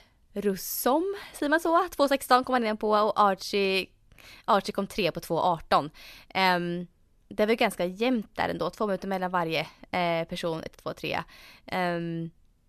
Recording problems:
none

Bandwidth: 13.5 kHz